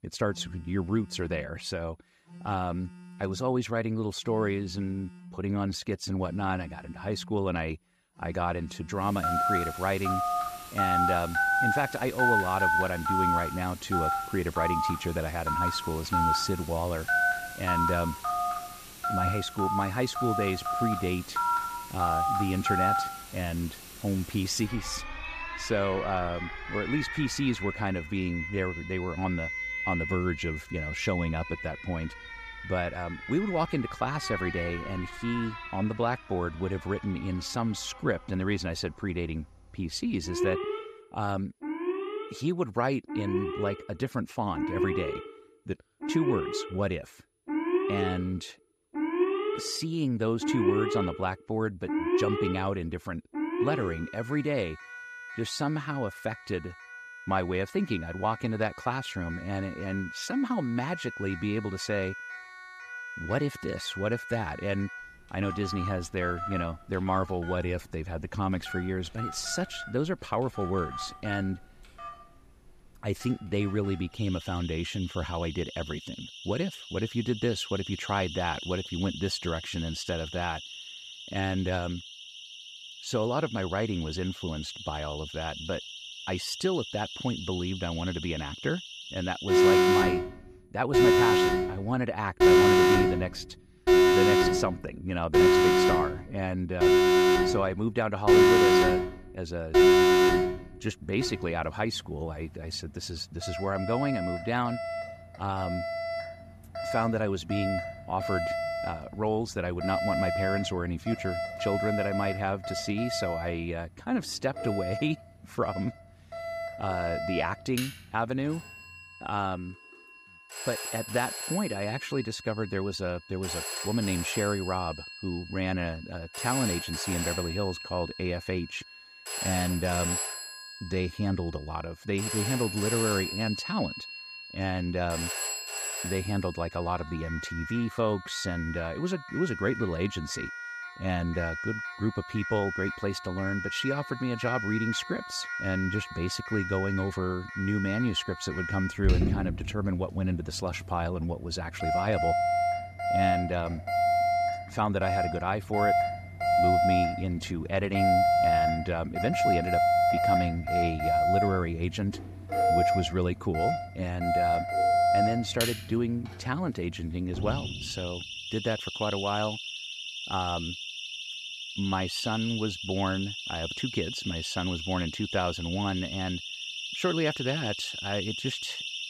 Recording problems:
alarms or sirens; very loud; throughout; 2 dB above the speech

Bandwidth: 14.5 kHz